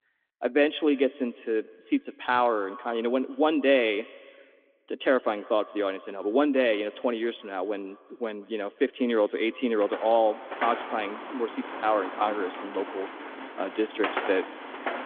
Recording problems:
echo of what is said; faint; throughout; 170 ms later, 20 dB below the speech
phone-call audio; nothing above 3.5 kHz
traffic noise; loud; from 10 s on; 9 dB below the speech

